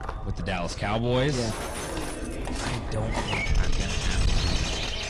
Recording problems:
distortion; heavy; 5 dB below the speech
garbled, watery; slightly
animal sounds; very loud; throughout; as loud as the speech
chatter from many people; noticeable; throughout; 10 dB below the speech
wind noise on the microphone; occasional gusts; 10 dB below the speech
footsteps; faint; at the start; peak 10 dB below the speech
jangling keys; noticeable; from 1.5 to 3 s; peak 2 dB below the speech

